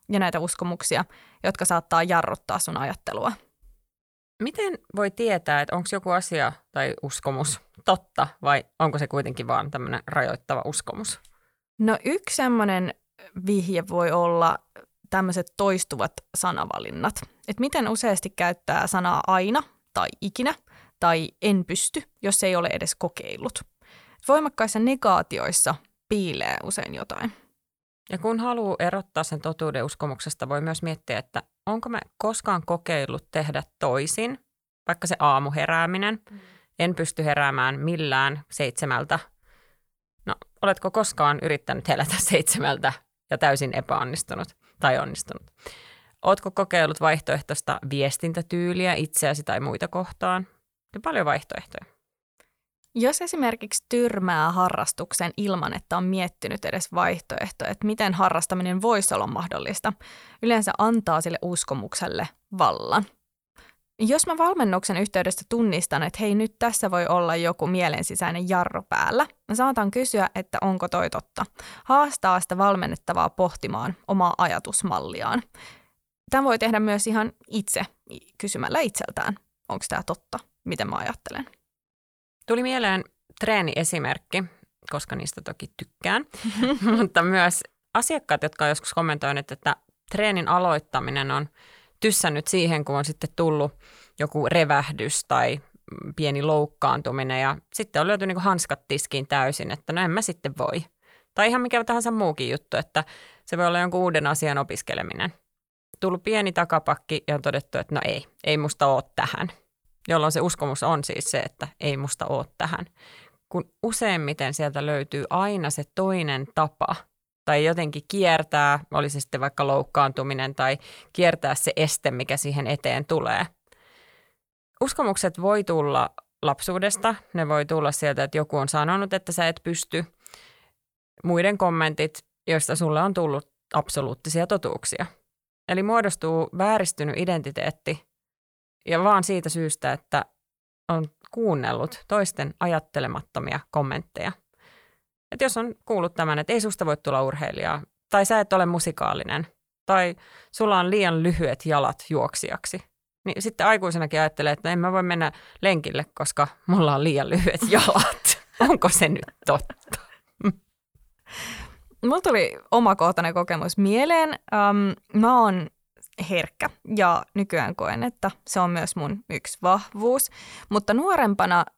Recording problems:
none

